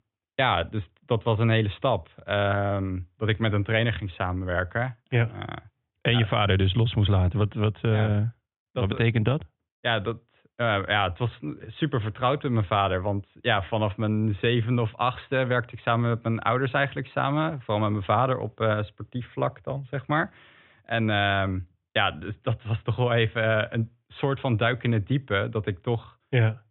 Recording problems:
high frequencies cut off; severe; nothing above 3.5 kHz

